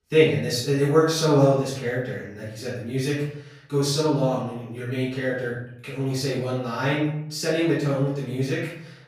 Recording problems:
off-mic speech; far
room echo; noticeable; dies away in 0.7 s

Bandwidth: 15.5 kHz